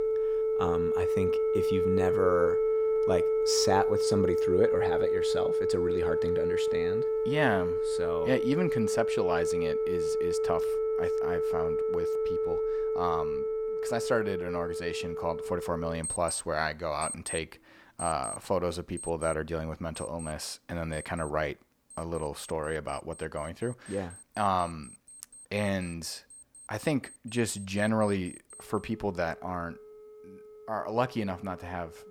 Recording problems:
alarms or sirens; very loud; throughout; 3 dB above the speech

